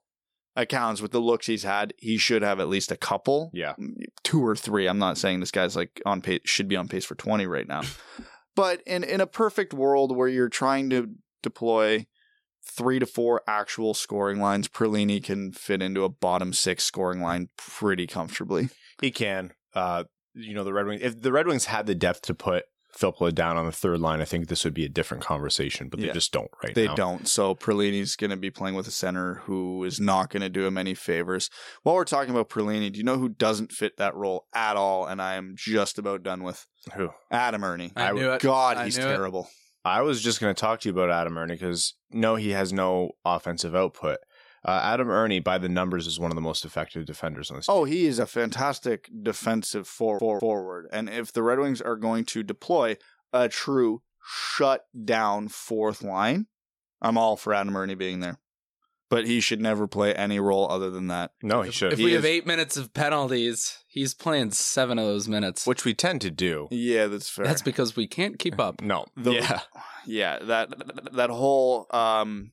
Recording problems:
audio stuttering; at 50 s and at 1:11

